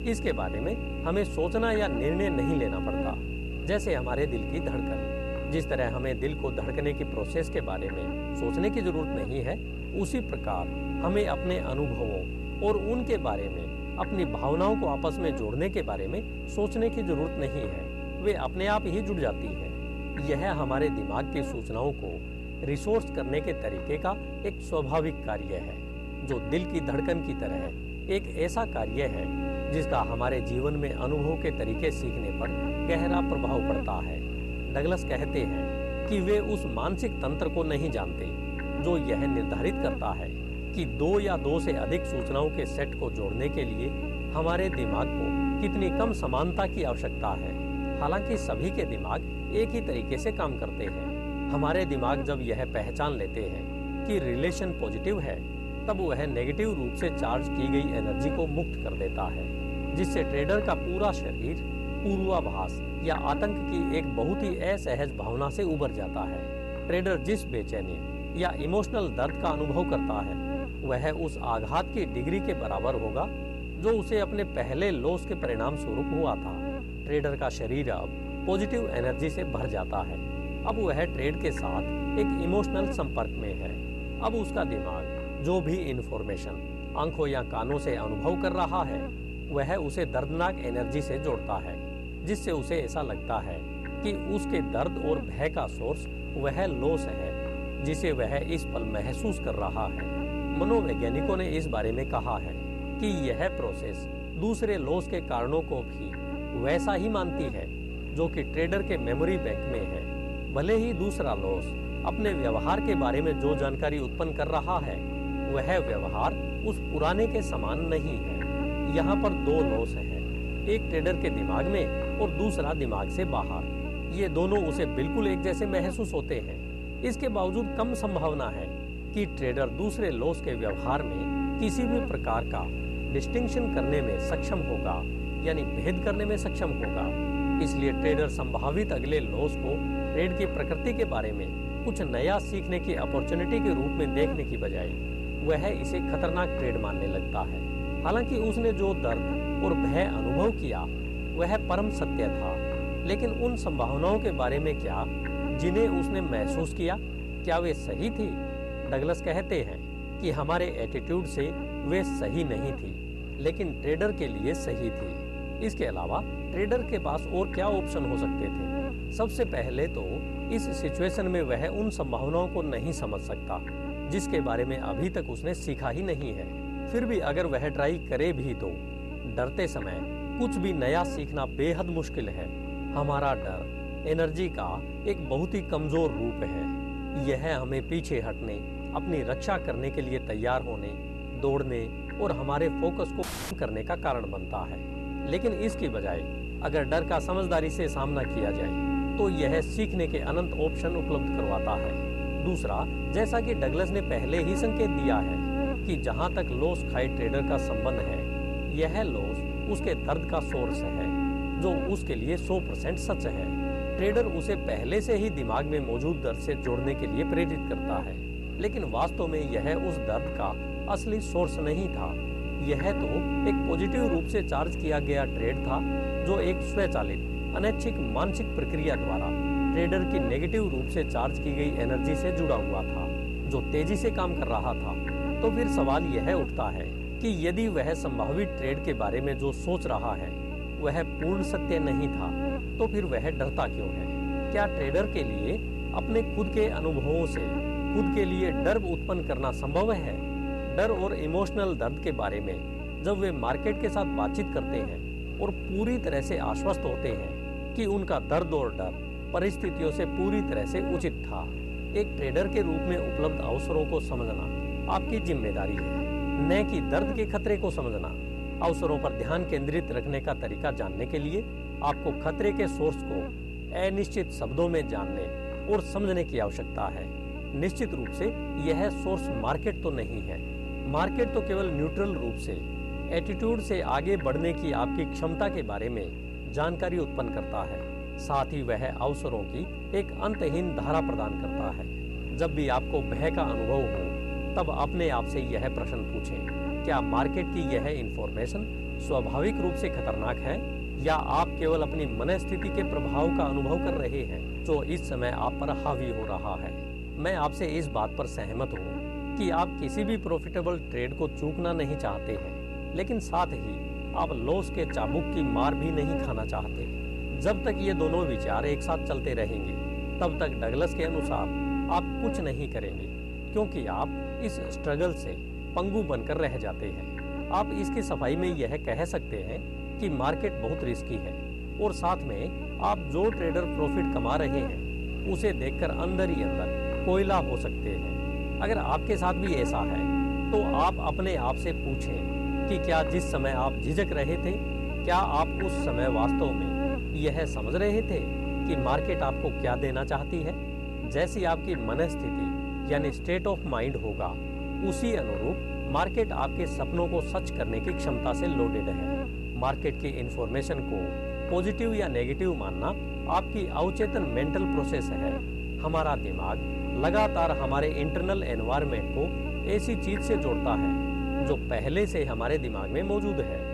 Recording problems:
electrical hum; loud; throughout; 60 Hz, 5 dB below the speech
audio cutting out; at 3:13

